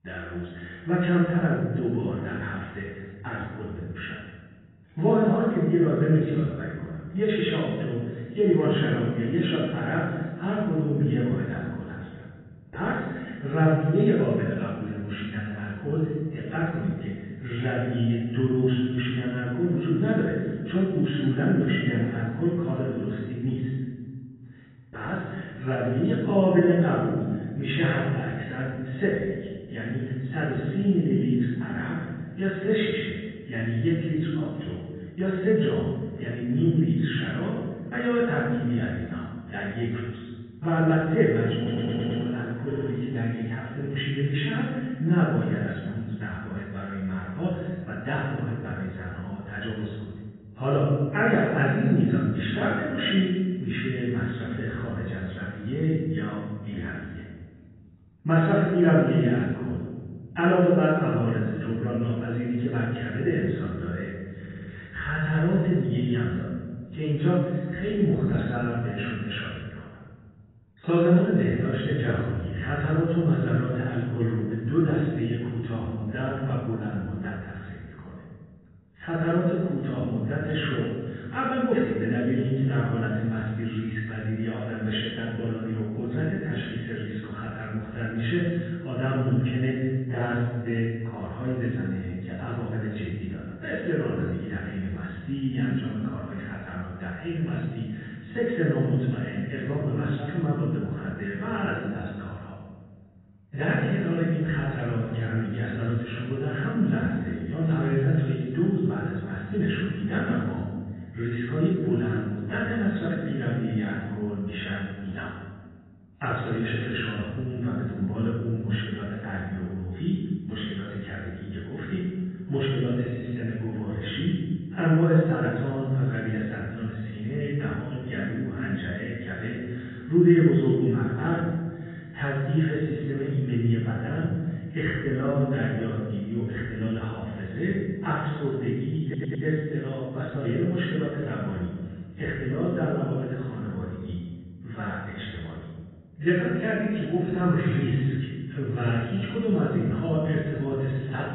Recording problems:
room echo; strong; dies away in 1.5 s
off-mic speech; far
garbled, watery; badly; nothing above 3.5 kHz
muffled; very slightly; fading above 3 kHz
audio stuttering; 4 times, first at 42 s

